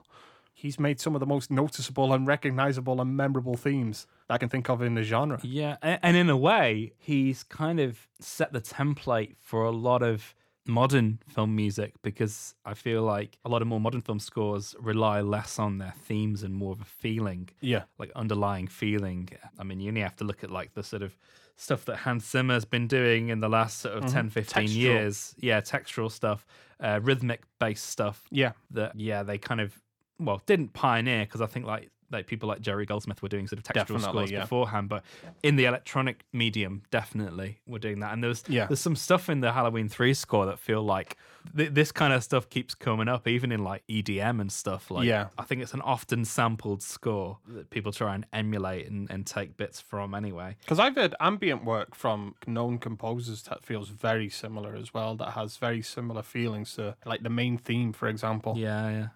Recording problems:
uneven, jittery; strongly; from 4 to 54 s

